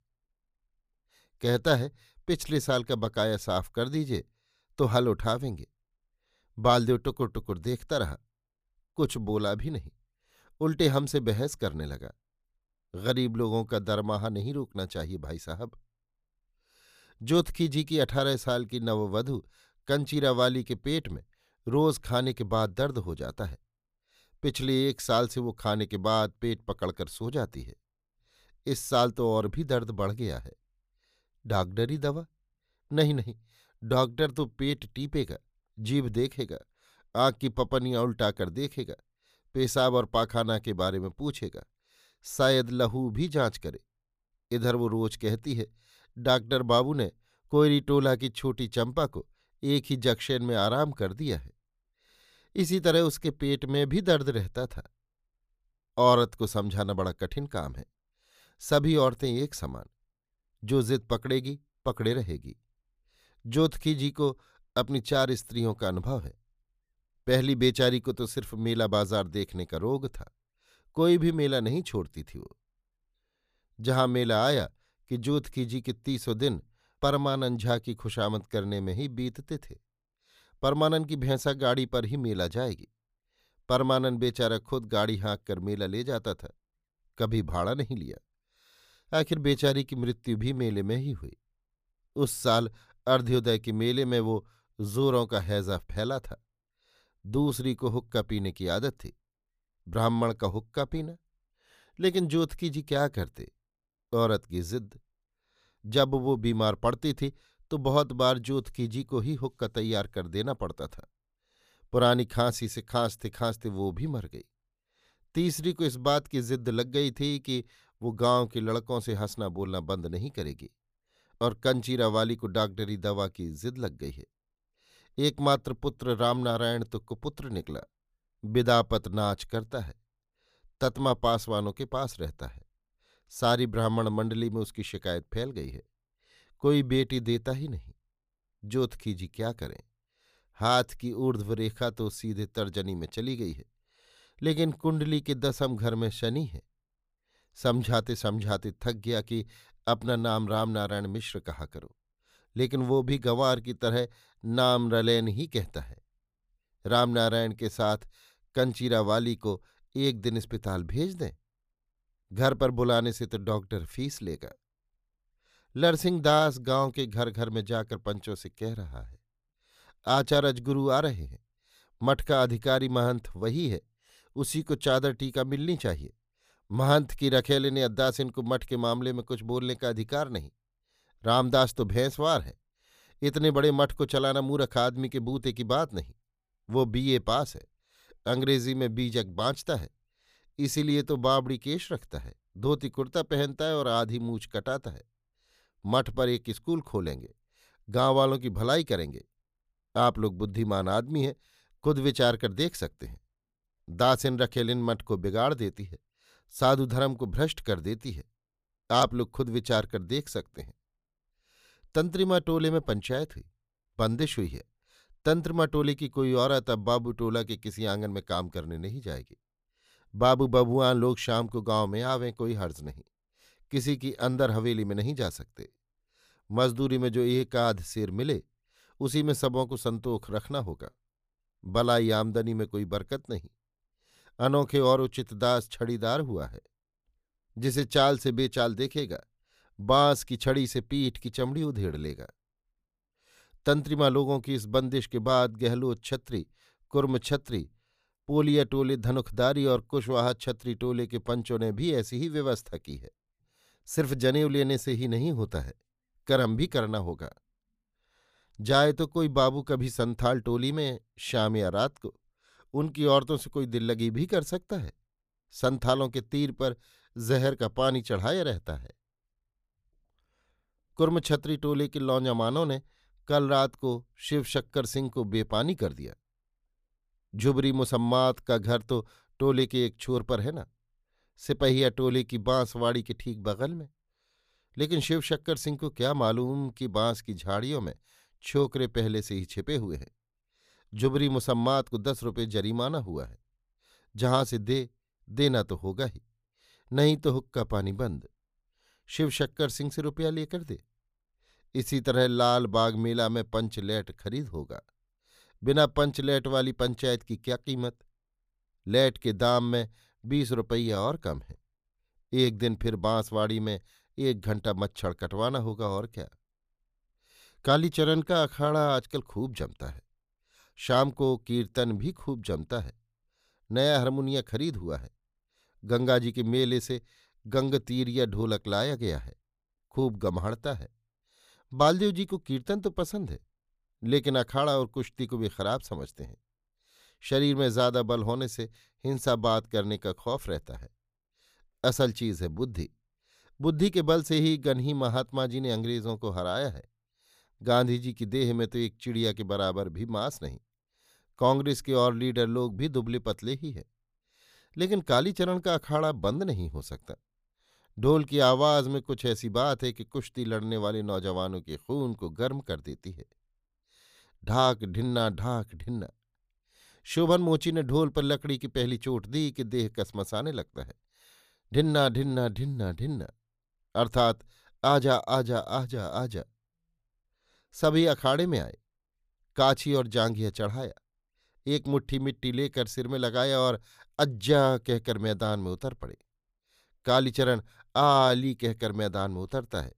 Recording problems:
none

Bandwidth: 15 kHz